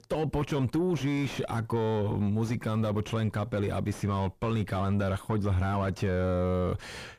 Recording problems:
distortion; heavy; 7 dB below the speech

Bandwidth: 14.5 kHz